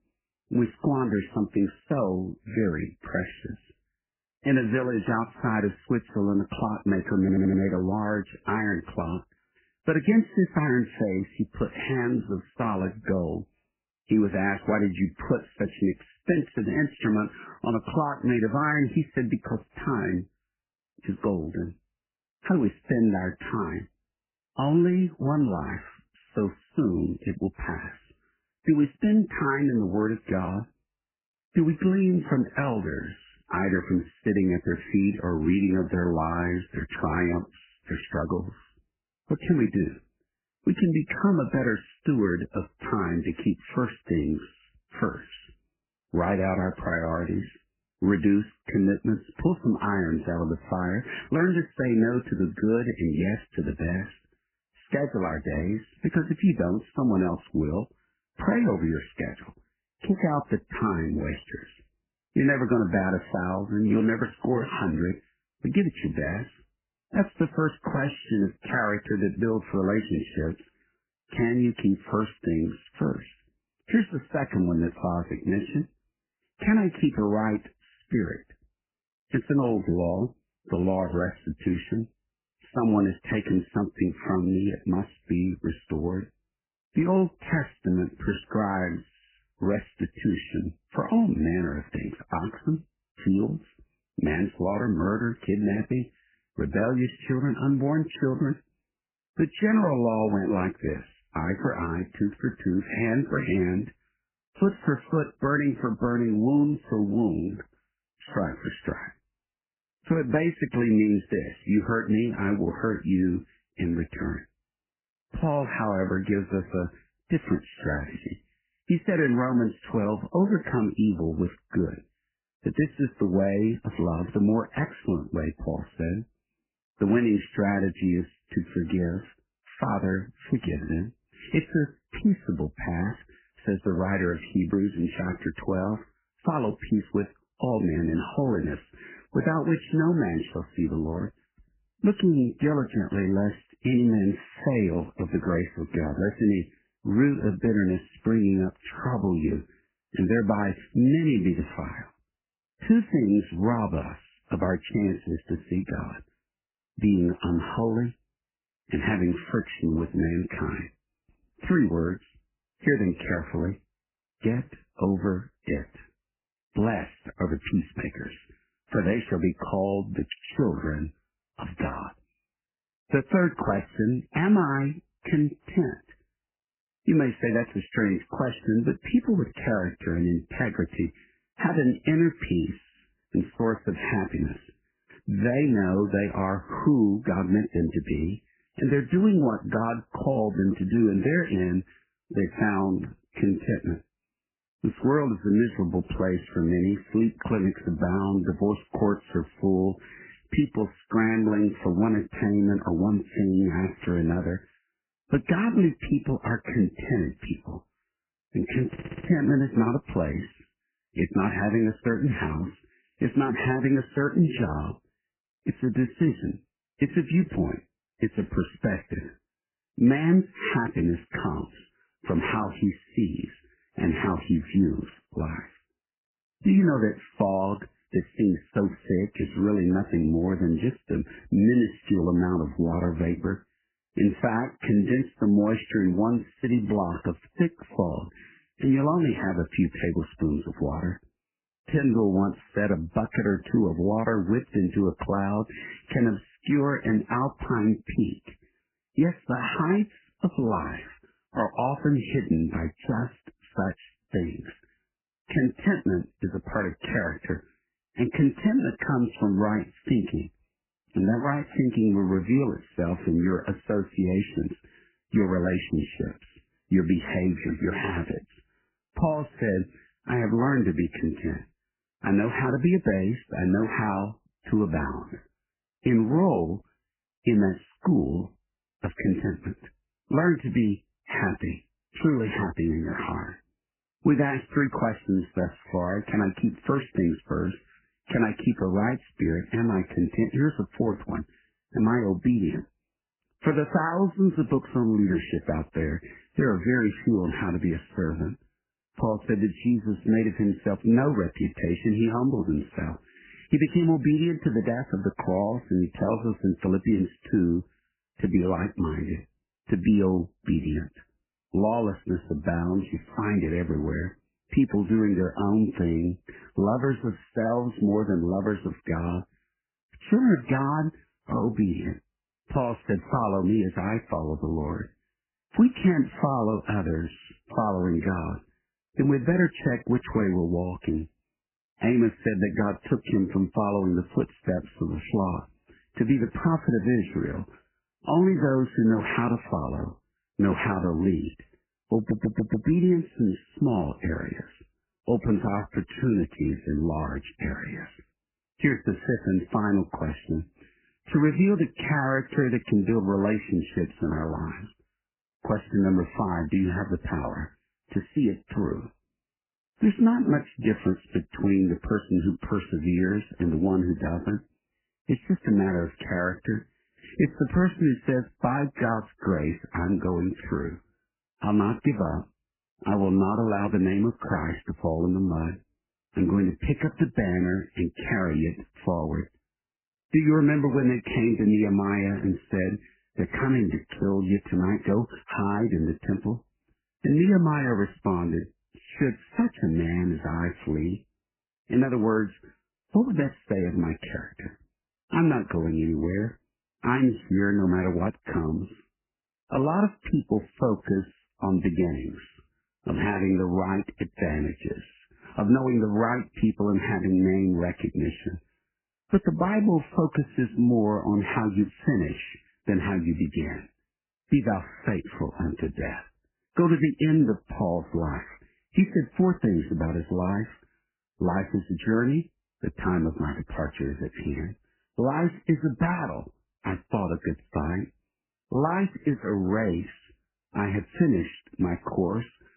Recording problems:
garbled, watery; badly; nothing above 3 kHz
audio stuttering; at 7 s, at 3:29 and at 5:42

